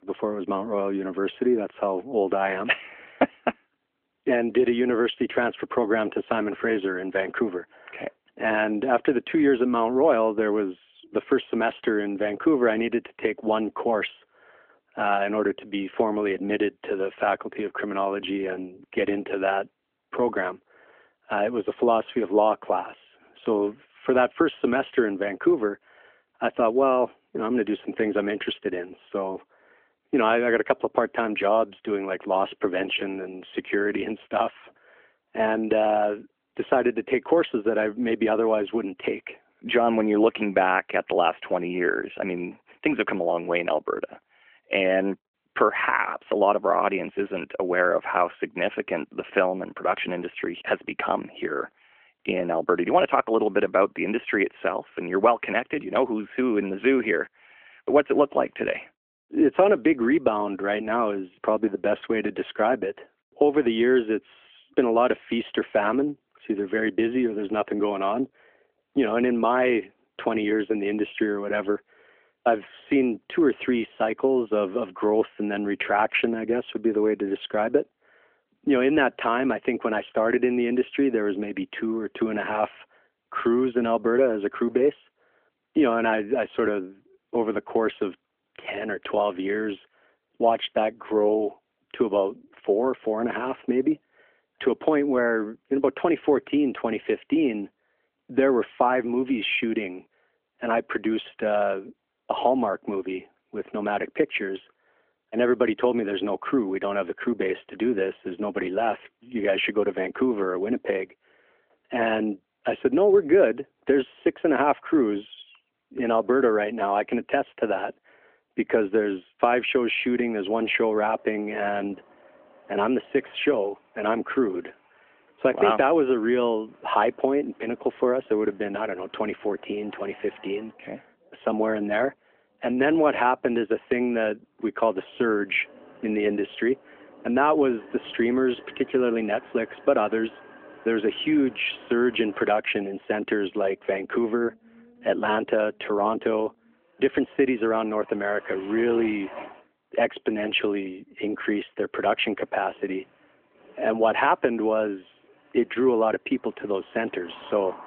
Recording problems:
phone-call audio; nothing above 3.5 kHz
traffic noise; faint; from 2:00 on; 25 dB below the speech

